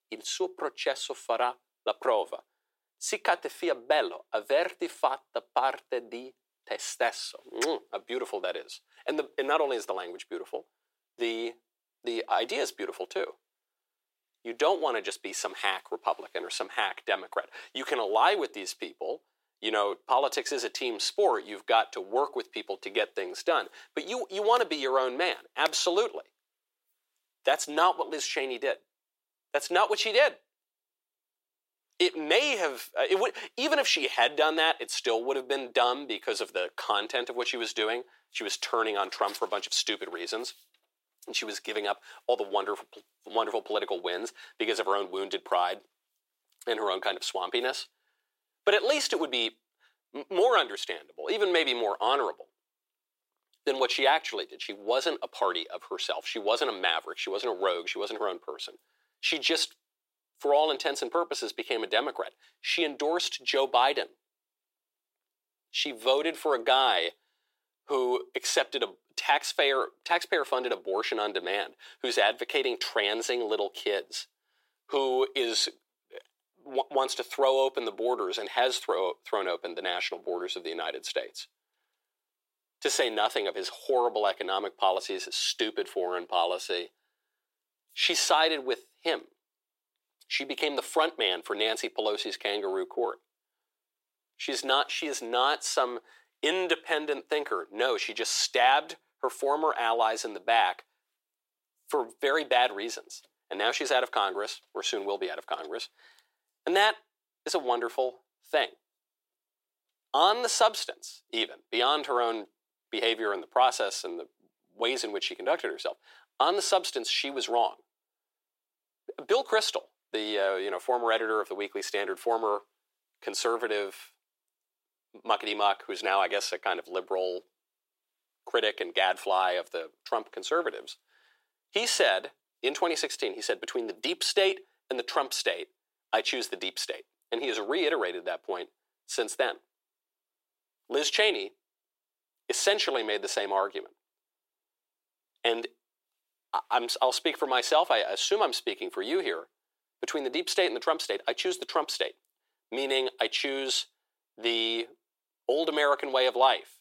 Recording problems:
thin; very; fading below 350 Hz

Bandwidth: 16 kHz